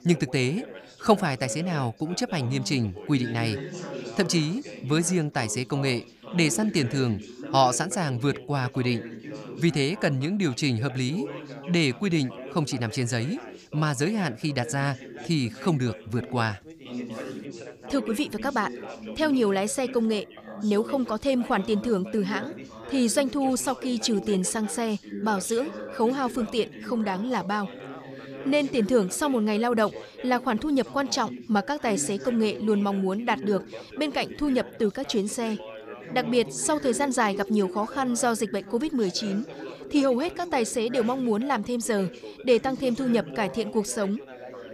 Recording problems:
background chatter; noticeable; throughout; 3 voices, 15 dB below the speech

